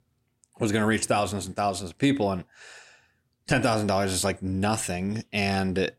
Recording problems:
none

